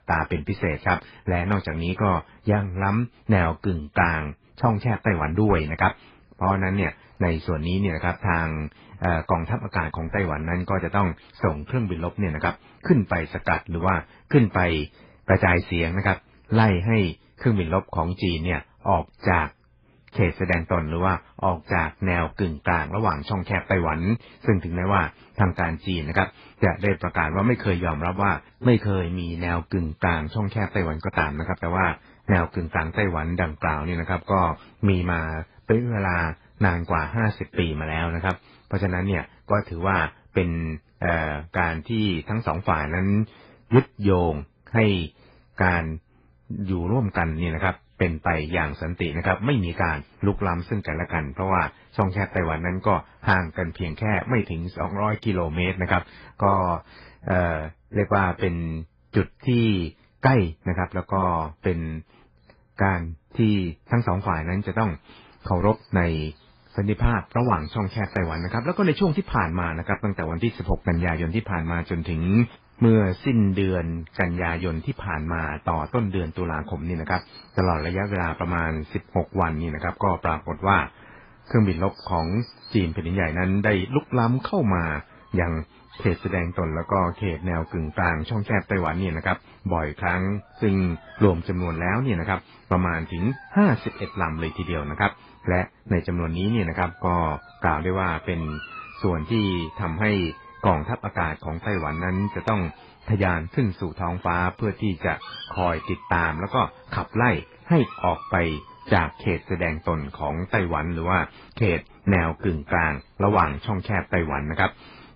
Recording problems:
garbled, watery; badly
animal sounds; faint; throughout; 20 dB below the speech

